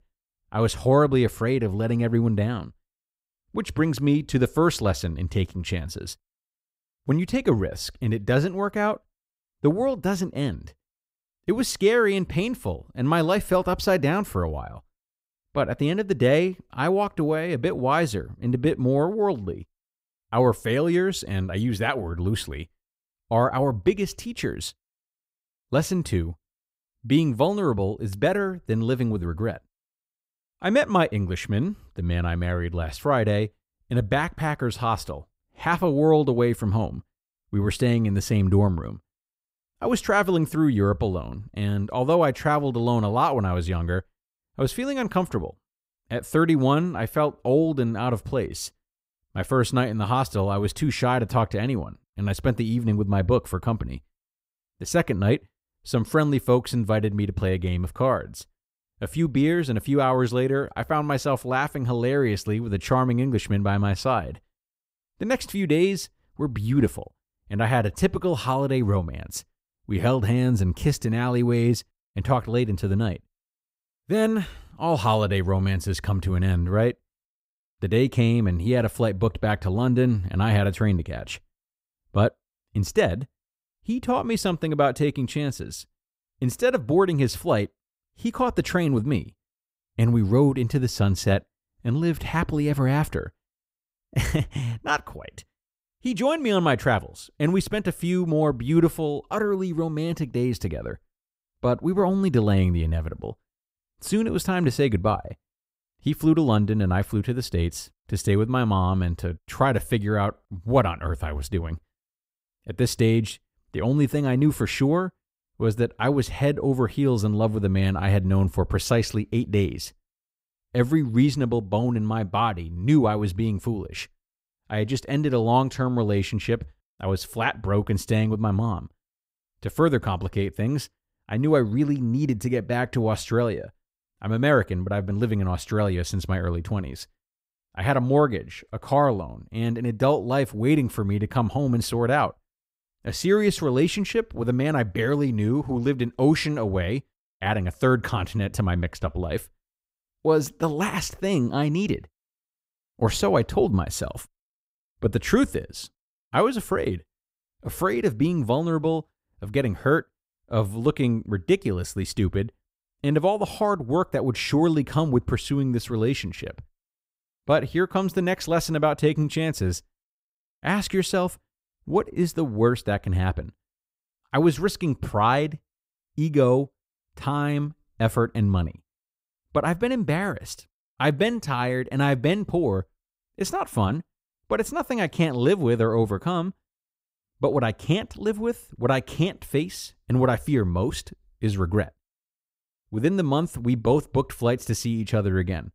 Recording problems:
none

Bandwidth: 15.5 kHz